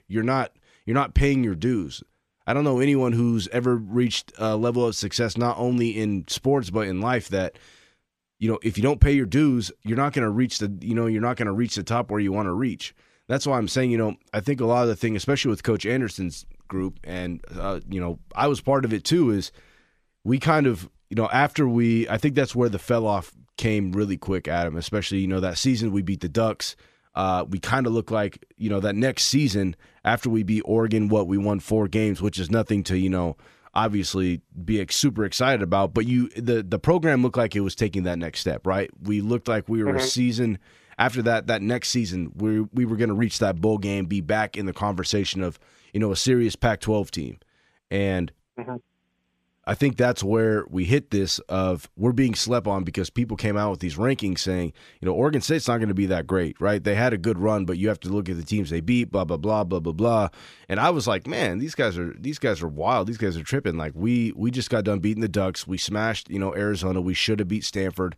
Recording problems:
none

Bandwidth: 14.5 kHz